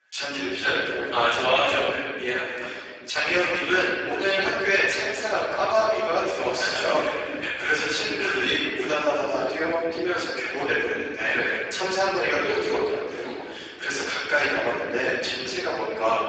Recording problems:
room echo; strong; dies away in 1.9 s
off-mic speech; far
garbled, watery; badly; nothing above 7.5 kHz
thin; somewhat; fading below 300 Hz

